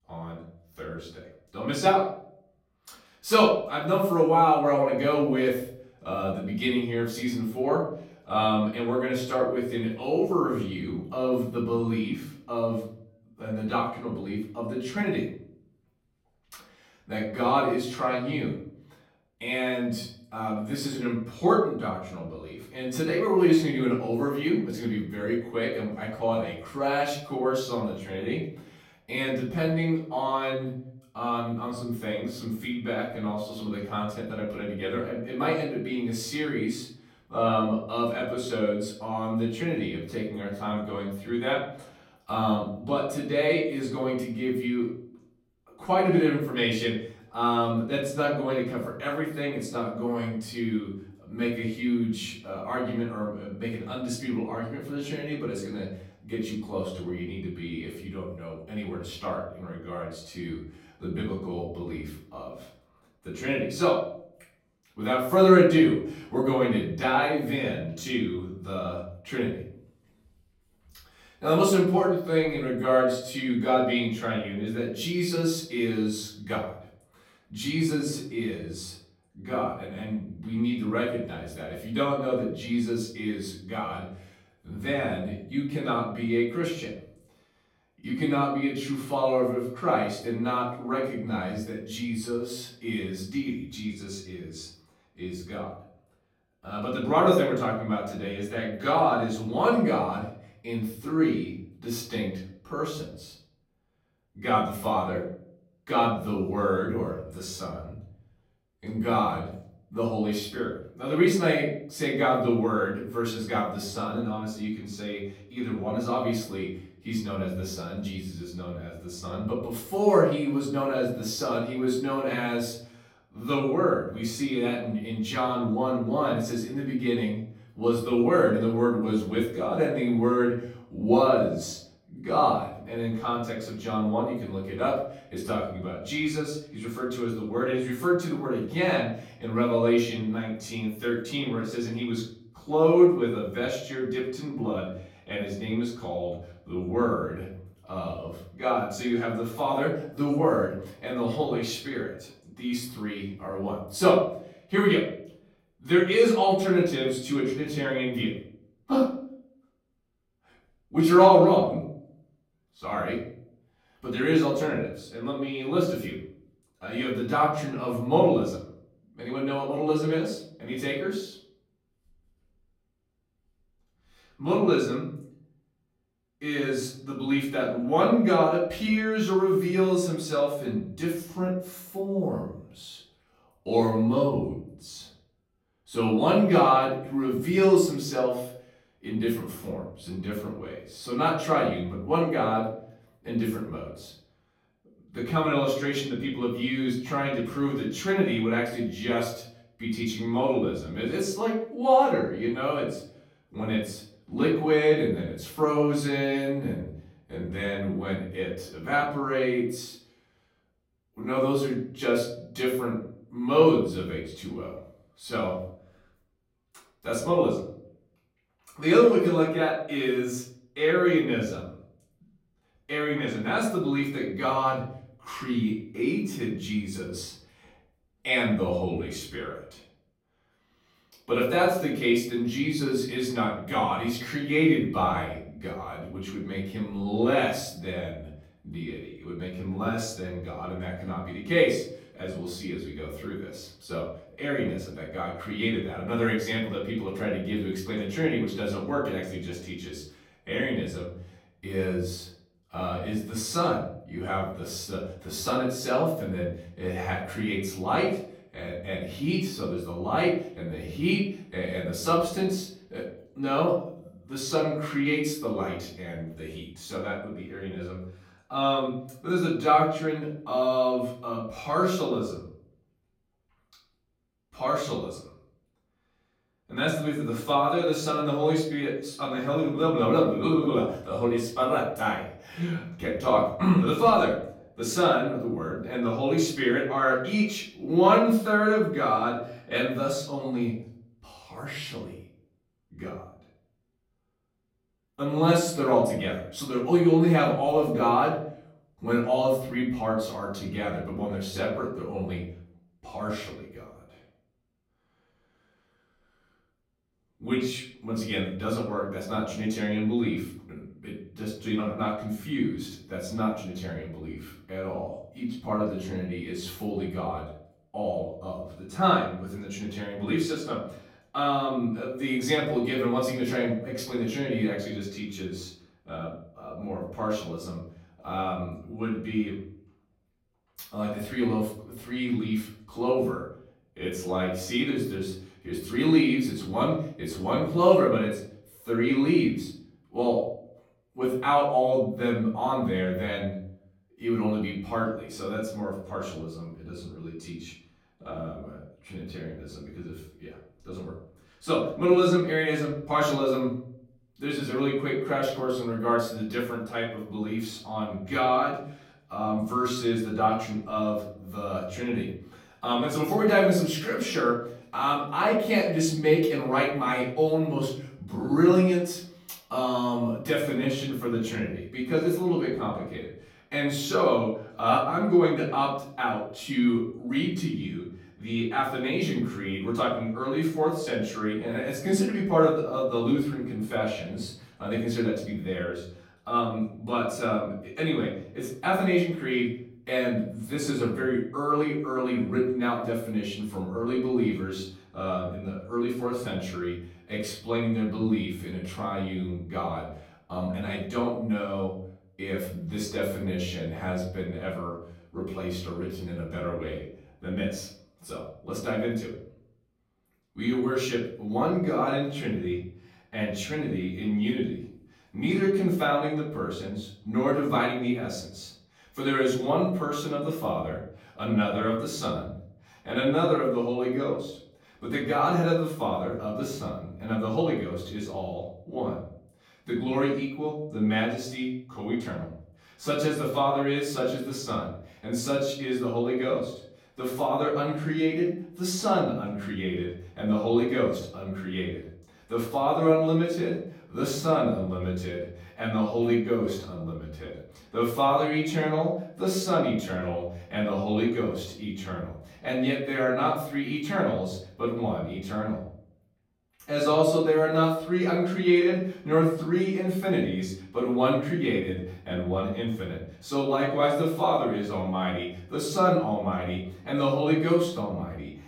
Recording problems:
off-mic speech; far
room echo; noticeable; dies away in 0.6 s

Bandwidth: 16.5 kHz